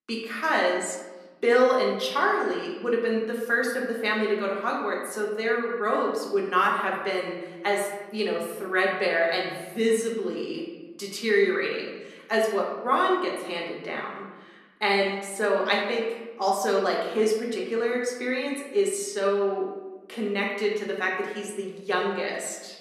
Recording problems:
off-mic speech; far
room echo; noticeable; dies away in 1.1 s

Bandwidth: 14 kHz